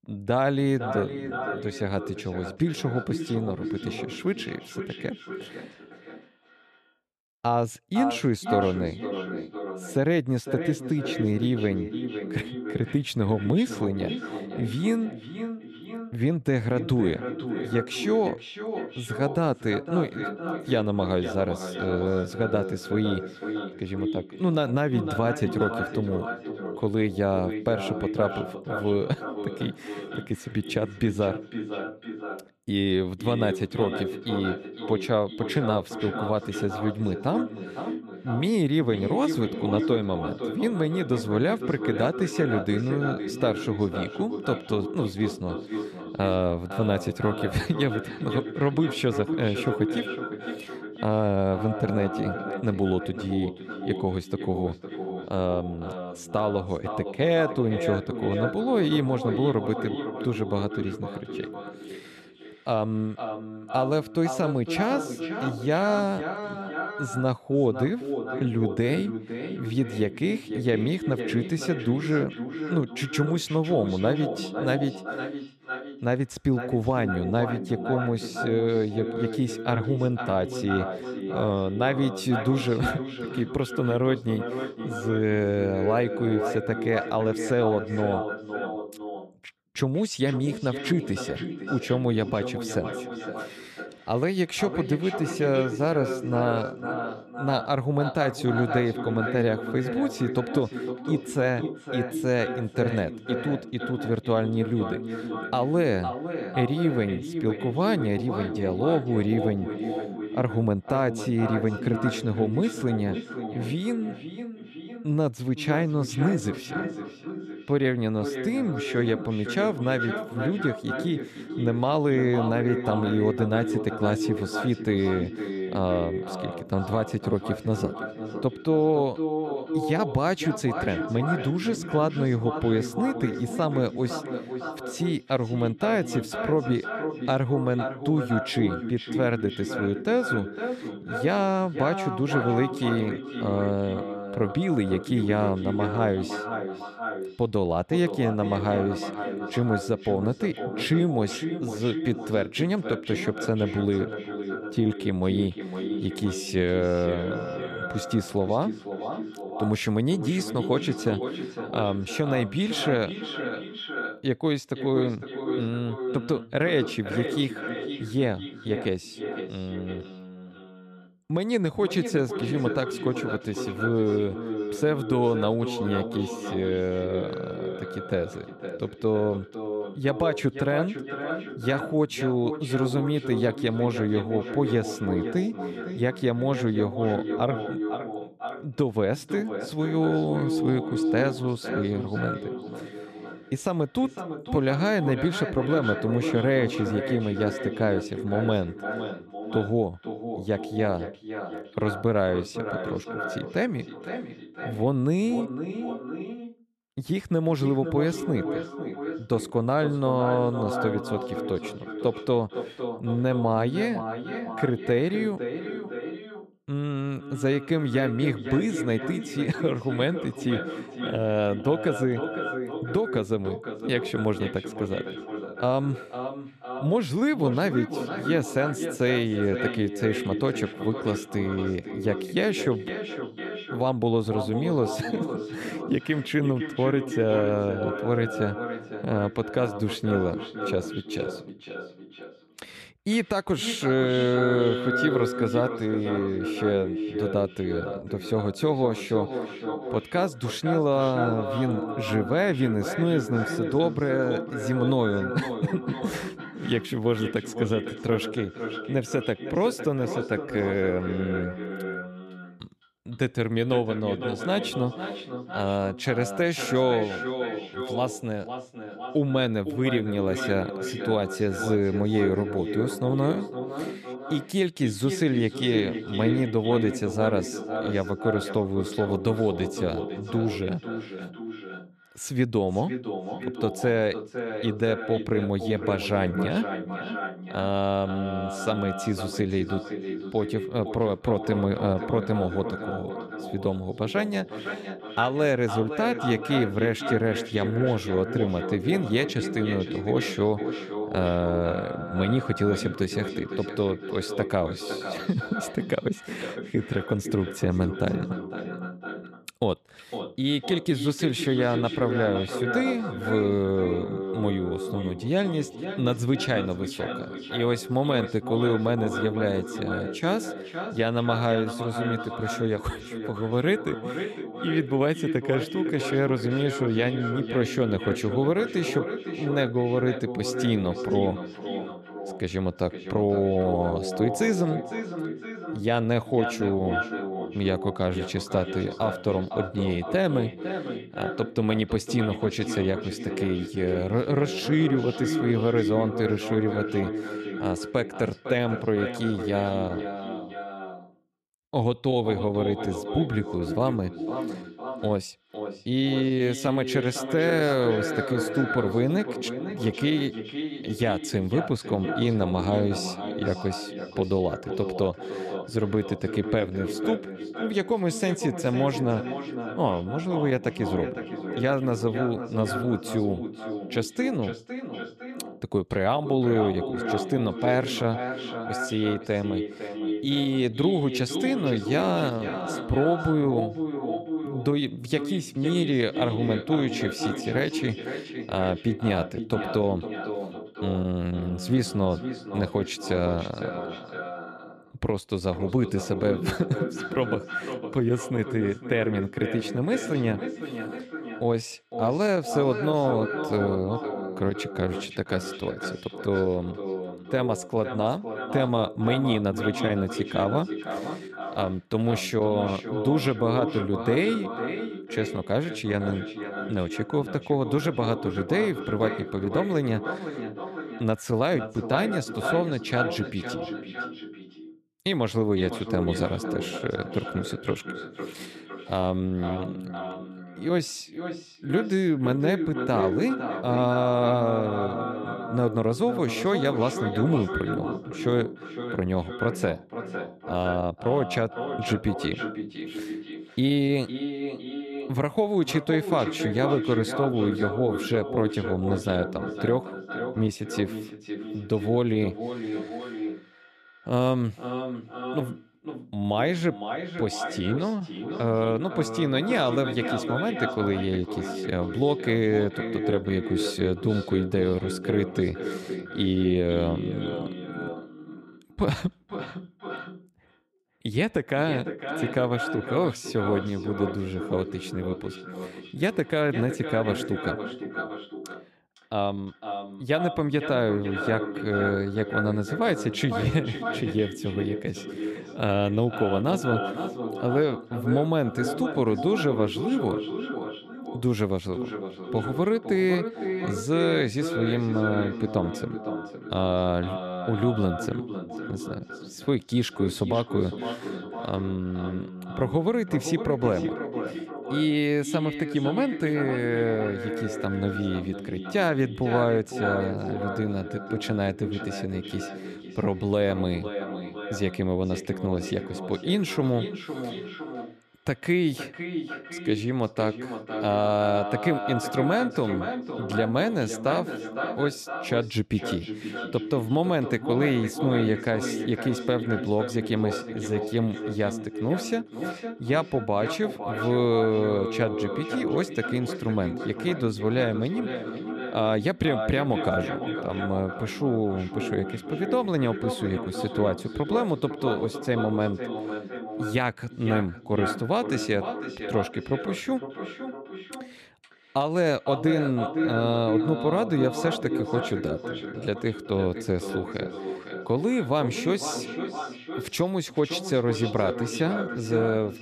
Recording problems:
echo of what is said; strong; throughout; 510 ms later, 6 dB below the speech

